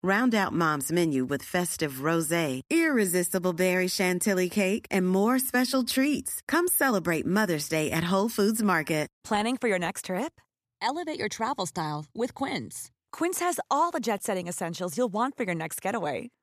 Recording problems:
none

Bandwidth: 14.5 kHz